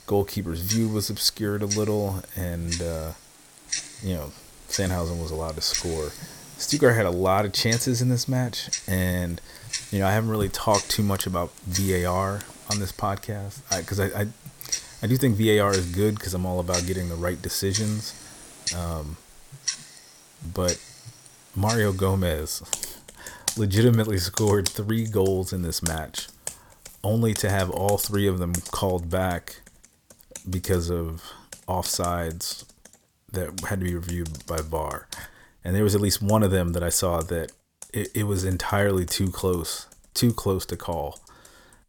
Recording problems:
household noises; loud; throughout; 8 dB below the speech

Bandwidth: 18.5 kHz